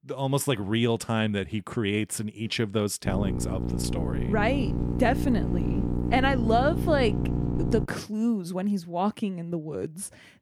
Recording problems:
electrical hum; loud; from 3 to 8 s; 60 Hz, 7 dB below the speech

